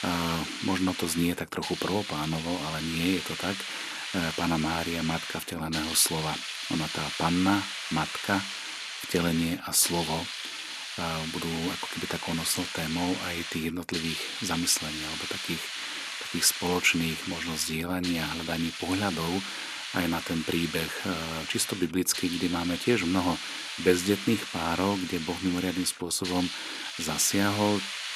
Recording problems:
hiss; loud; throughout; 5 dB below the speech

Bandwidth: 13.5 kHz